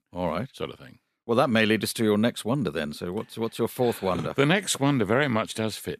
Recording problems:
none

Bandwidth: 14.5 kHz